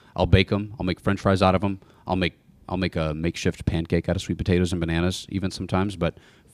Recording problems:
none

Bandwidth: 15 kHz